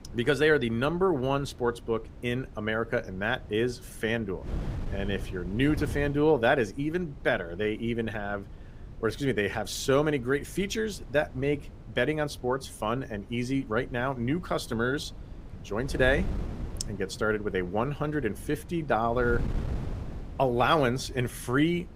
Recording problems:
wind noise on the microphone; occasional gusts; 20 dB below the speech

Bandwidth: 15.5 kHz